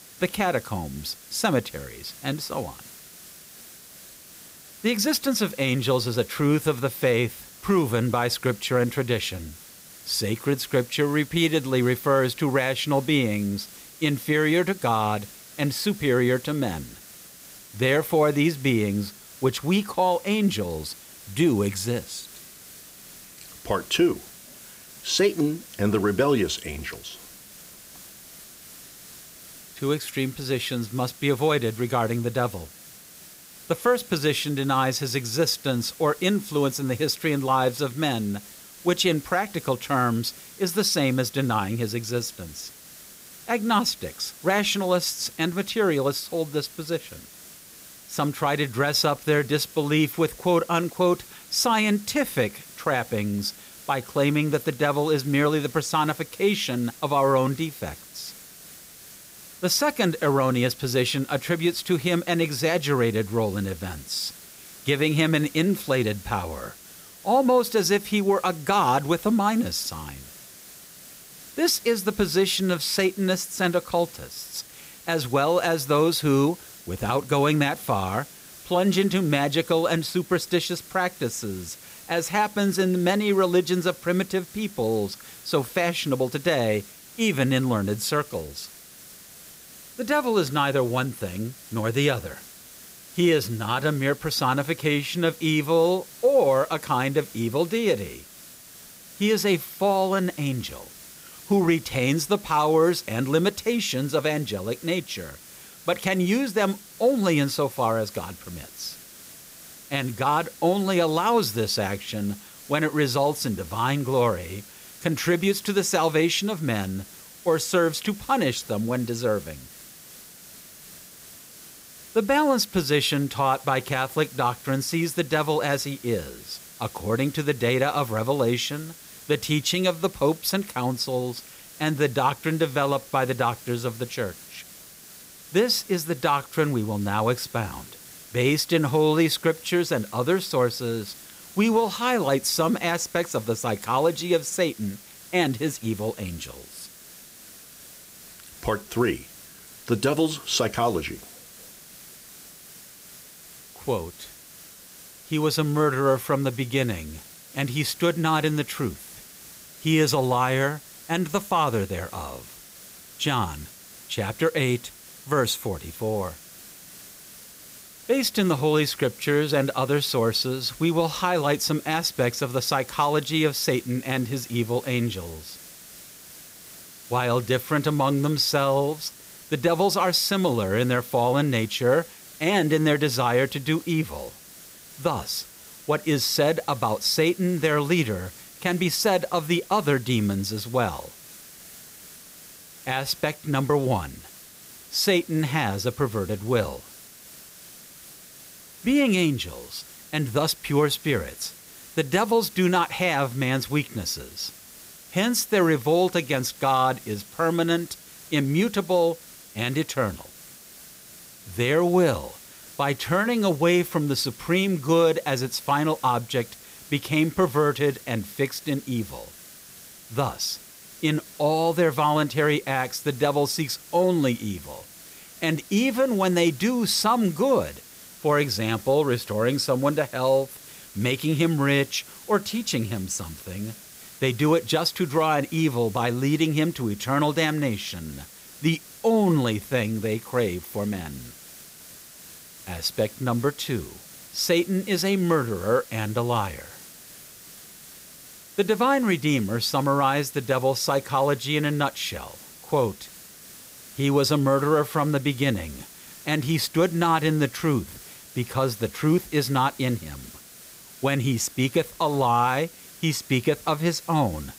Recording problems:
hiss; noticeable; throughout; 20 dB below the speech

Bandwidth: 15.5 kHz